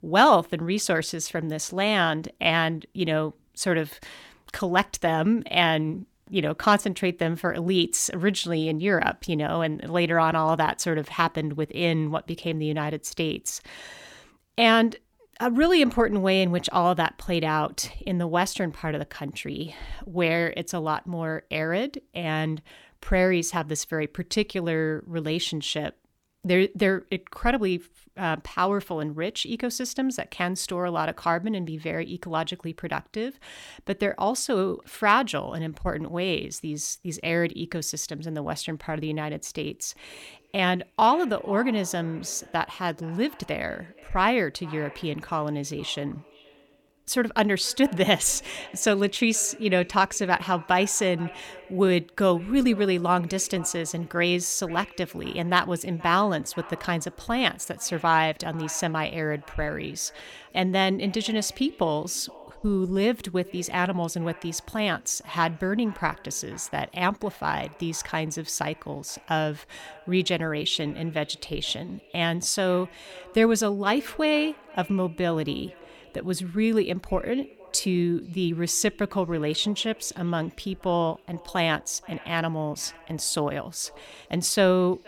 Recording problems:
echo of what is said; faint; from 40 s on; 470 ms later, 20 dB below the speech

